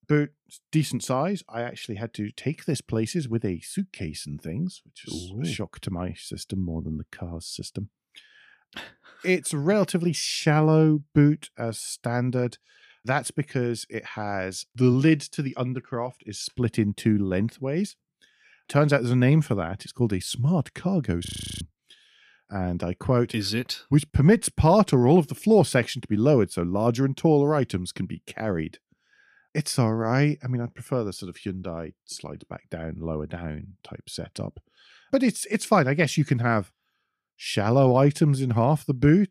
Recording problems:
audio freezing; at 21 s

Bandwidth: 15 kHz